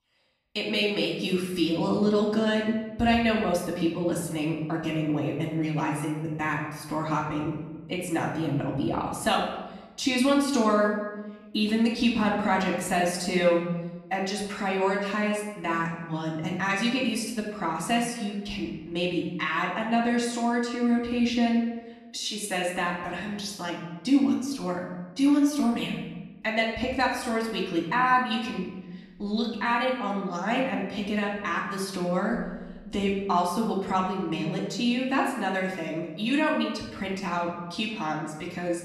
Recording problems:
off-mic speech; far
room echo; noticeable; dies away in 0.9 s

